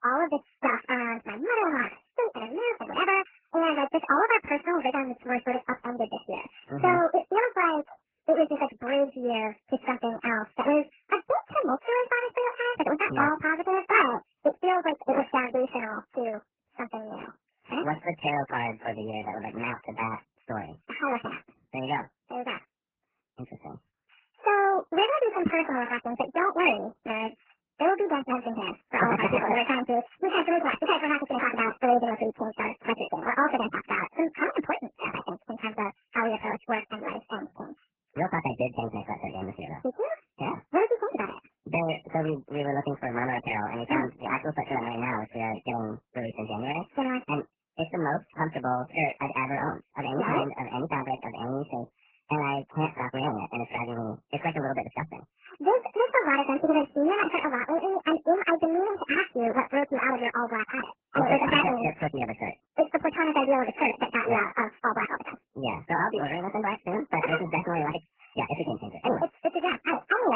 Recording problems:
garbled, watery; badly; nothing above 3 kHz
wrong speed and pitch; too fast and too high; 1.5 times normal speed
abrupt cut into speech; at the end

